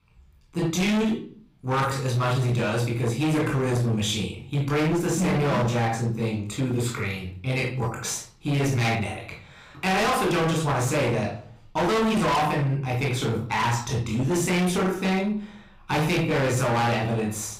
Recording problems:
distortion; heavy; 22% of the sound clipped
off-mic speech; far
room echo; noticeable; dies away in 0.5 s

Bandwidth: 15.5 kHz